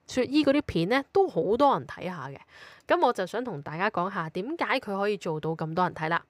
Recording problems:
none

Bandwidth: 15.5 kHz